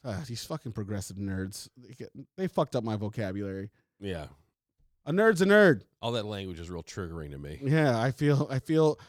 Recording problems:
none

